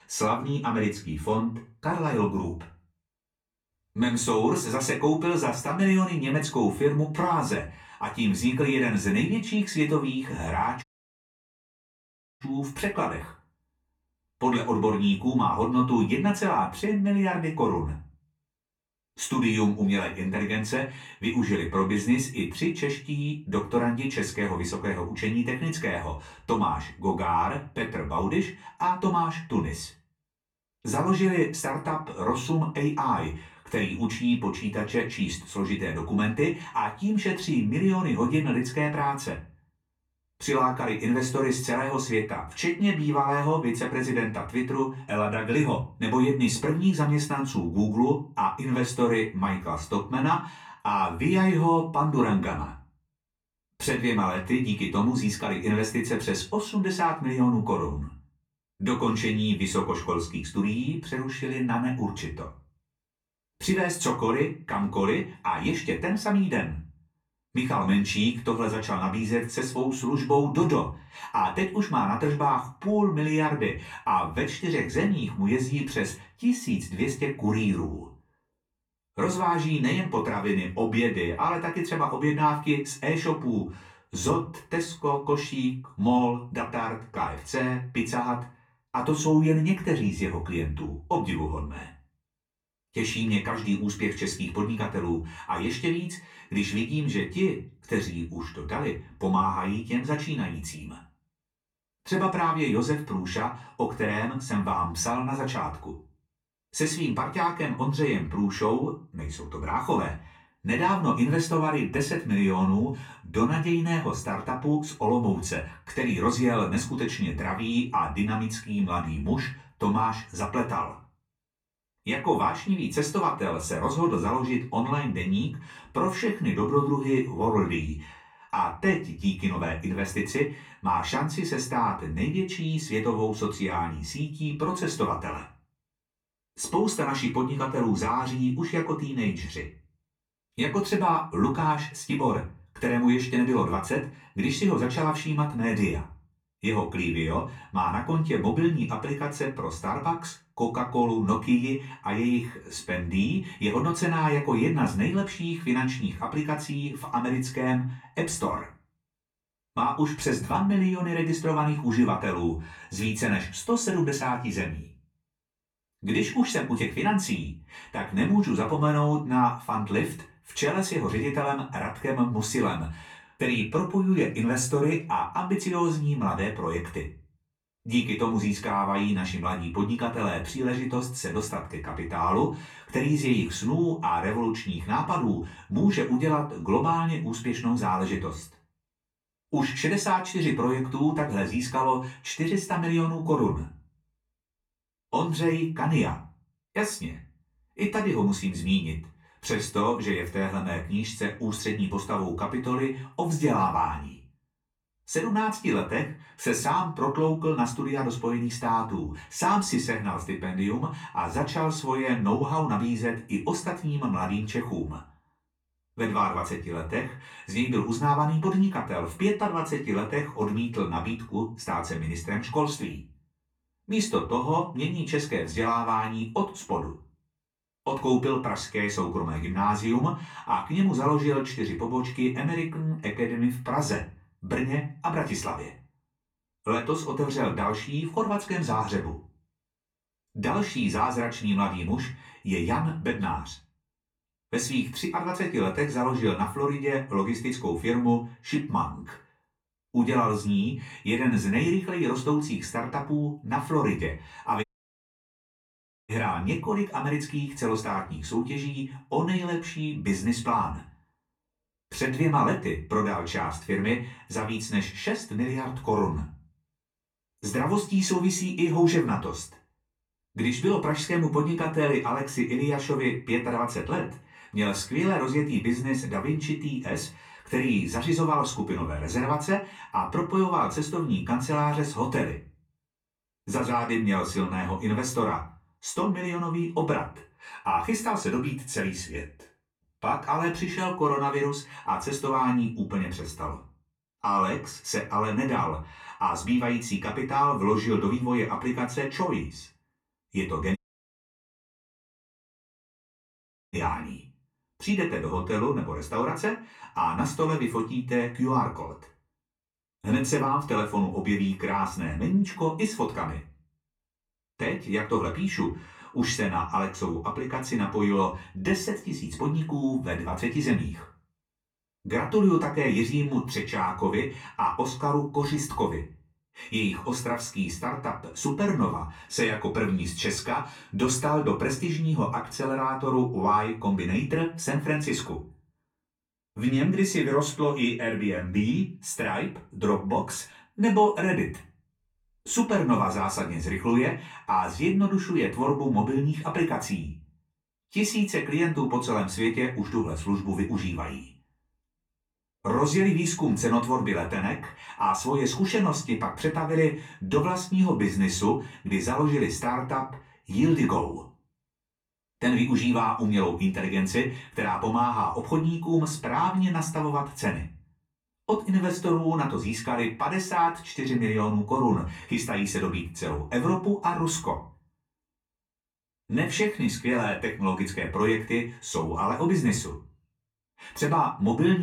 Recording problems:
off-mic speech; far
room echo; slight; dies away in 0.3 s
audio cutting out; at 11 s for 1.5 s, at 4:15 for 1.5 s and at 5:01 for 3 s
abrupt cut into speech; at the end

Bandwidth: 18 kHz